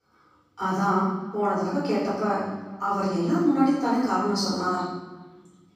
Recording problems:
room echo; strong; dies away in 1 s
off-mic speech; far
echo of what is said; faint; throughout; 420 ms later, 25 dB below the speech

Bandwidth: 15 kHz